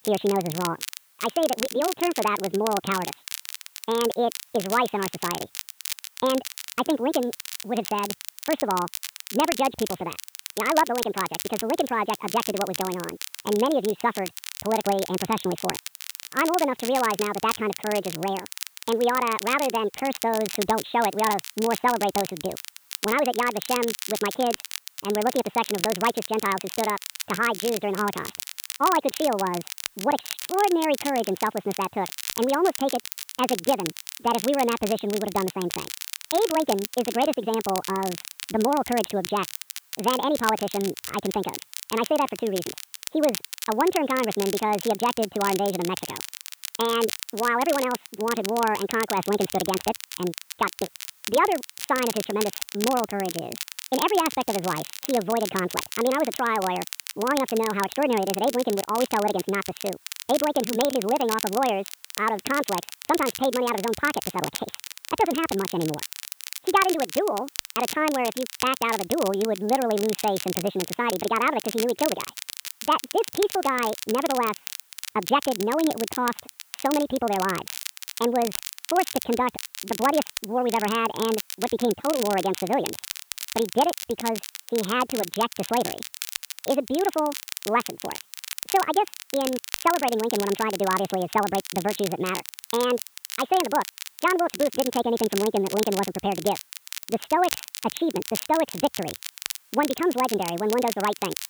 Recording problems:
high frequencies cut off; severe; nothing above 4 kHz
wrong speed and pitch; too fast and too high; 1.6 times normal speed
crackle, like an old record; loud; 8 dB below the speech
hiss; faint; throughout; 30 dB below the speech

